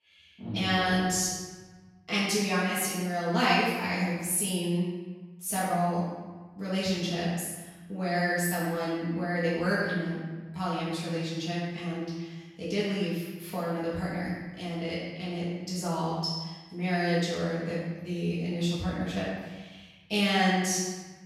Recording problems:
room echo; strong; dies away in 1.2 s
off-mic speech; far

